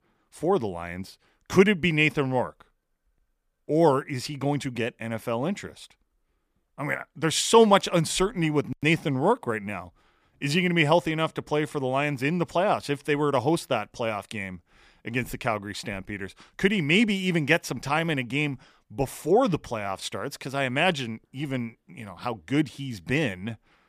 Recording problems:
none

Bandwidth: 15 kHz